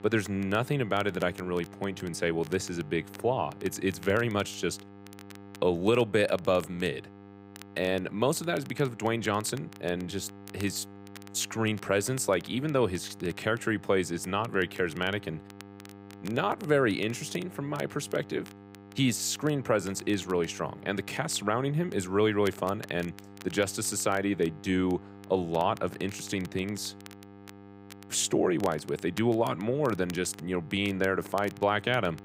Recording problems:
electrical hum; faint; throughout; 50 Hz, 20 dB below the speech
crackle, like an old record; faint; 25 dB below the speech

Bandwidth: 15.5 kHz